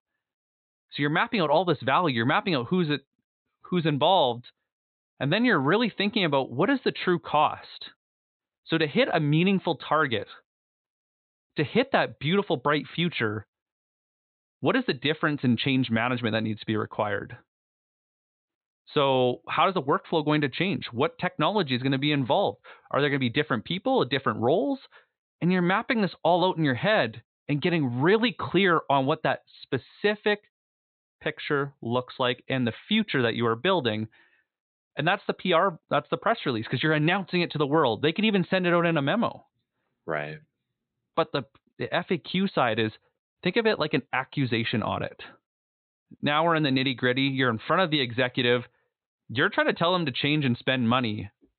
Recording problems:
high frequencies cut off; severe; nothing above 4 kHz

